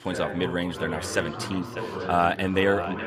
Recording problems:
echo of what is said; noticeable; throughout; 600 ms later, 15 dB below the speech
background chatter; loud; throughout; 2 voices, 8 dB below the speech

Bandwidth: 15.5 kHz